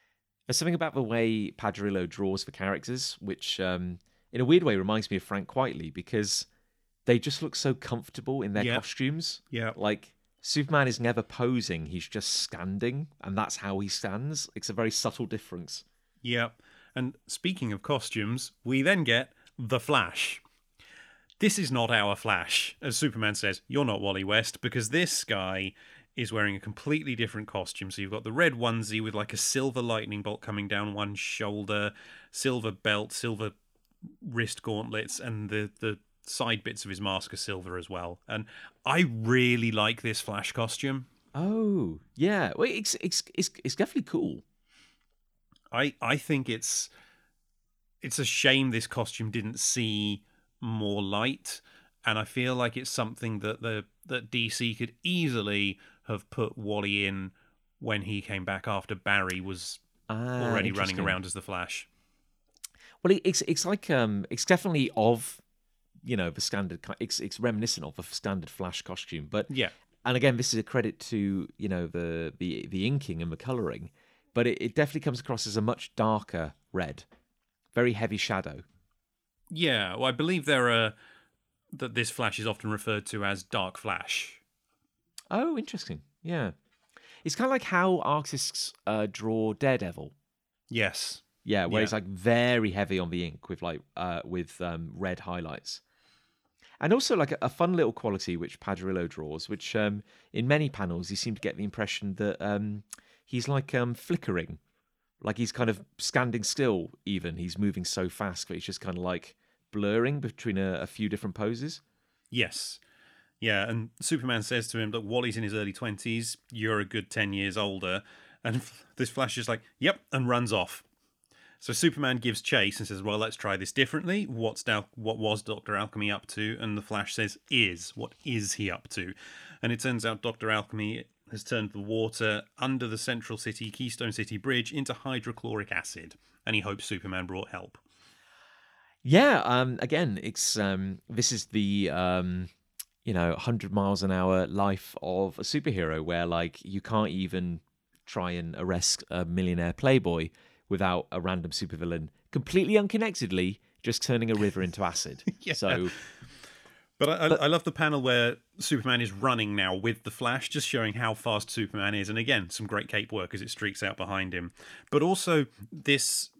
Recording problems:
none

